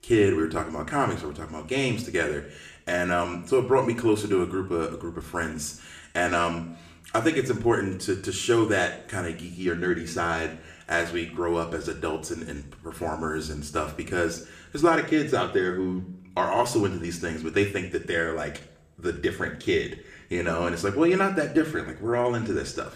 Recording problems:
room echo; slight; dies away in 0.5 s
off-mic speech; somewhat distant

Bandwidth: 14.5 kHz